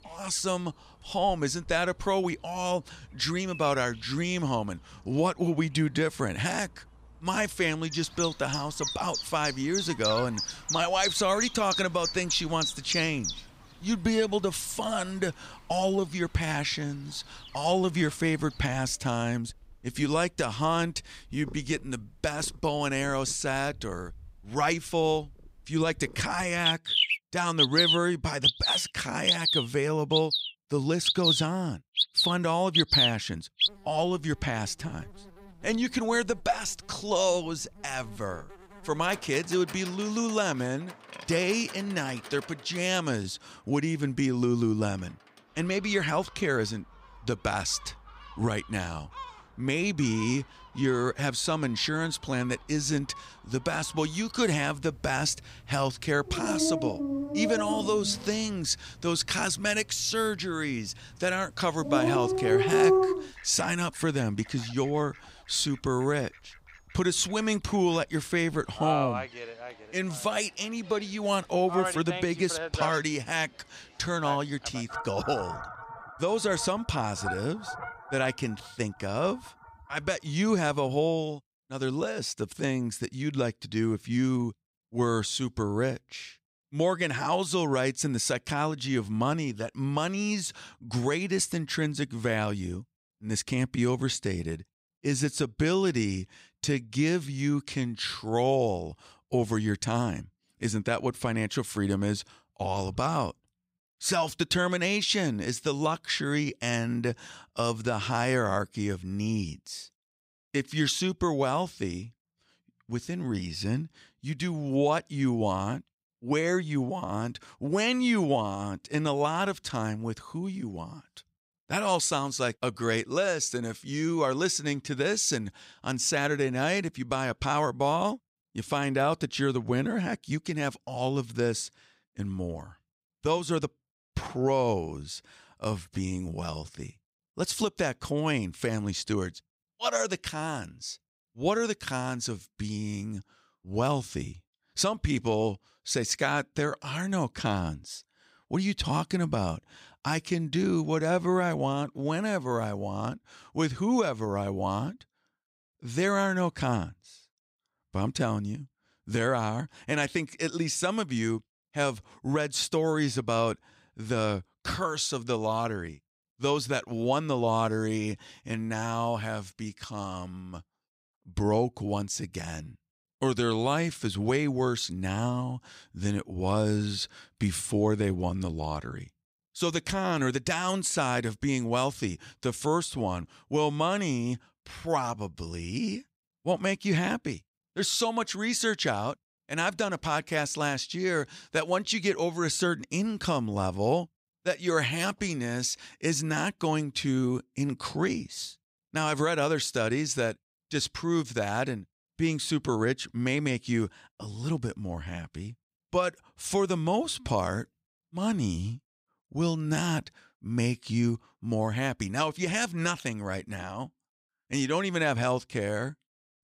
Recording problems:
animal sounds; very loud; until 1:21; as loud as the speech

